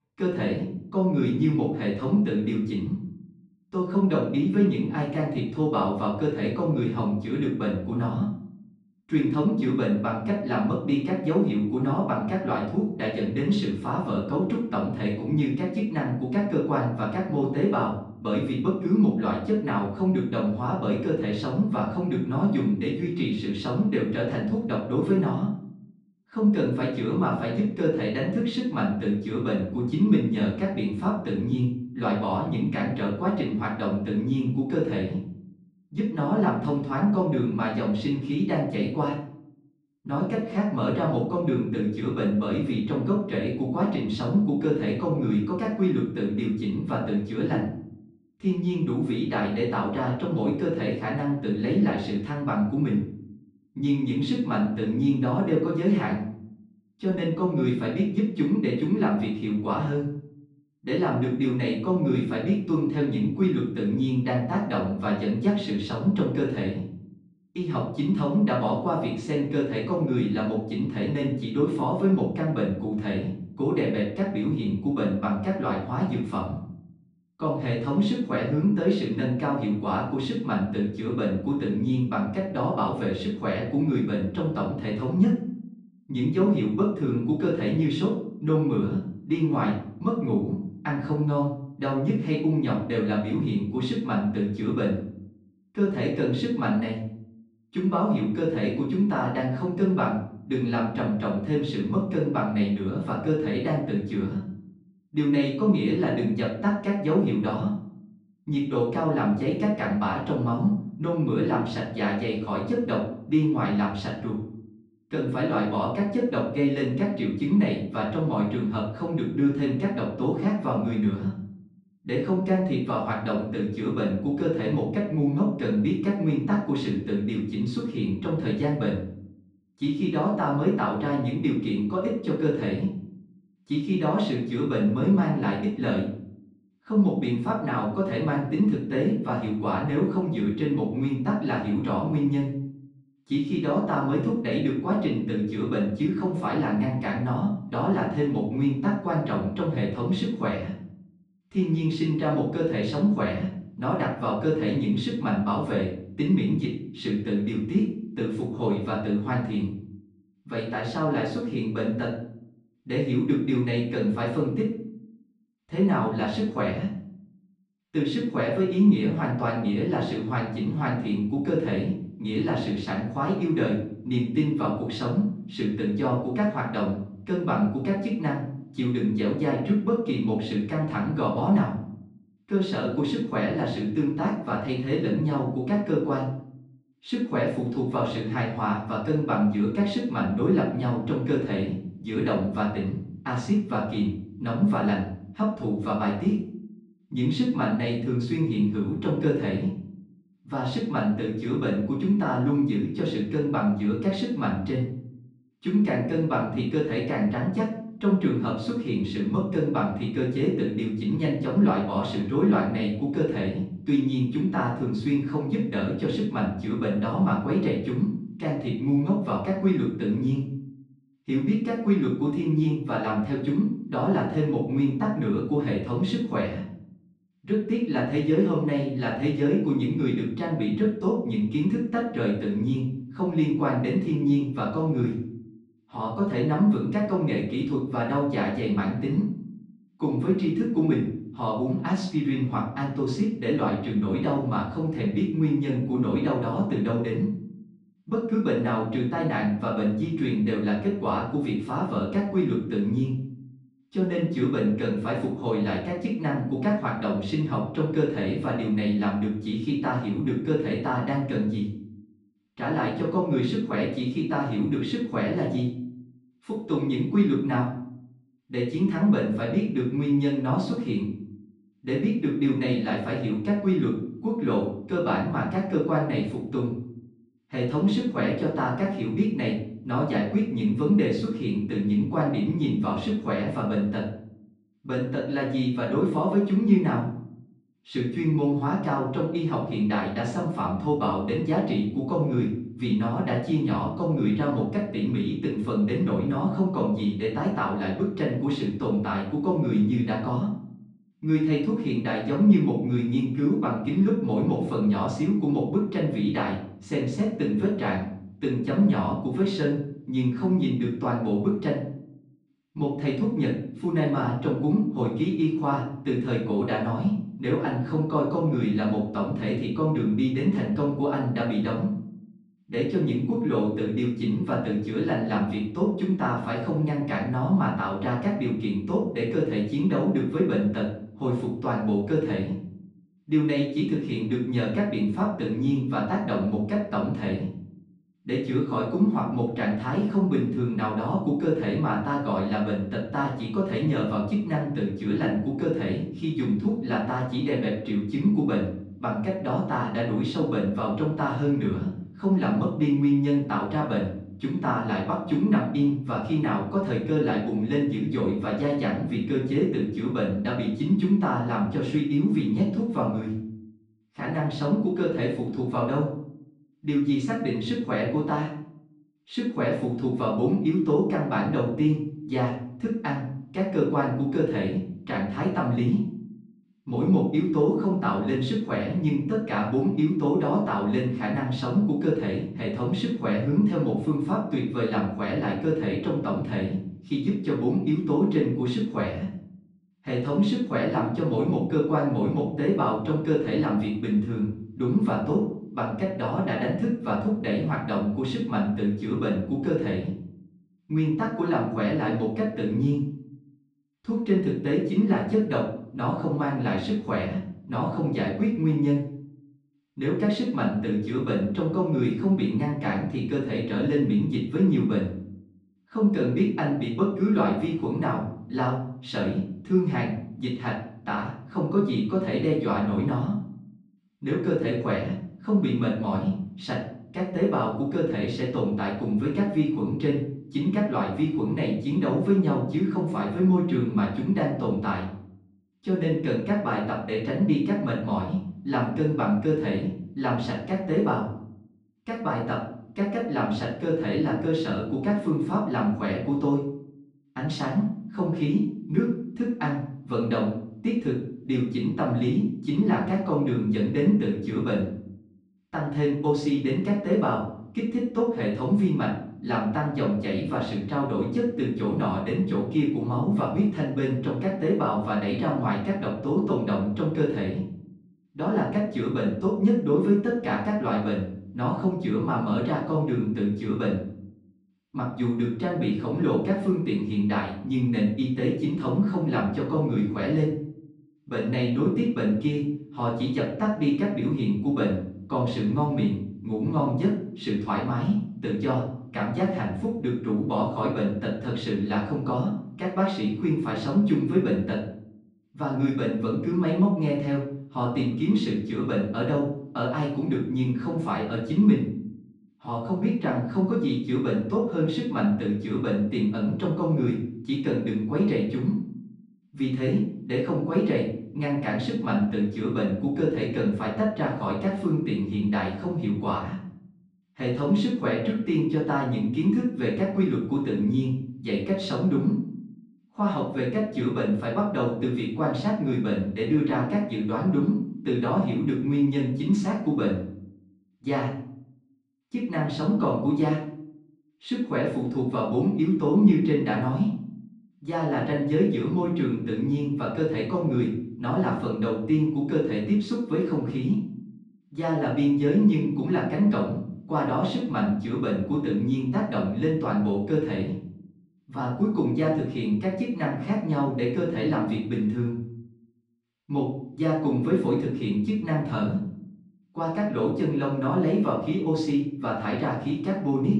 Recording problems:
off-mic speech; far
room echo; noticeable; dies away in 0.6 s

